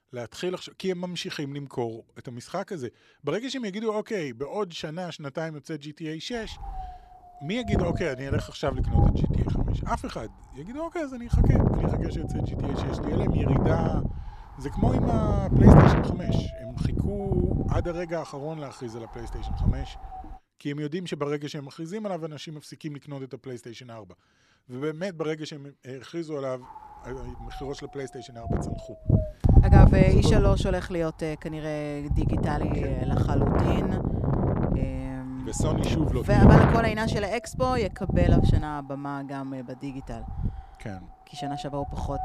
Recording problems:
wind noise on the microphone; heavy; from 6.5 to 20 s and from 27 s on; 2 dB above the speech

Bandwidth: 14 kHz